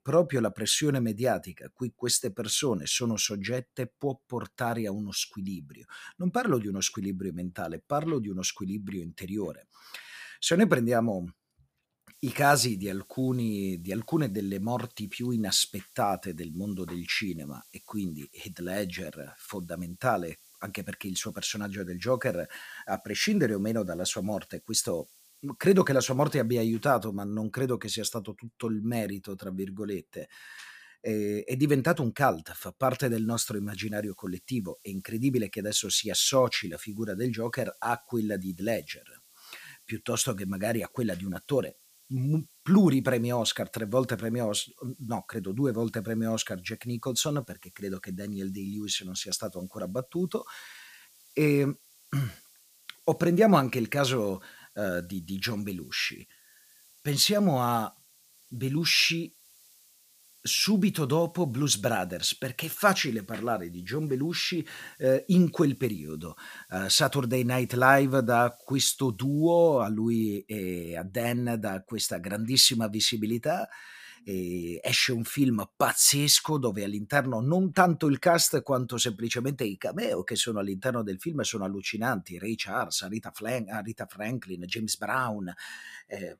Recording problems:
hiss; faint; from 12 to 27 s and from 33 s to 1:10; 25 dB below the speech

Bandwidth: 15 kHz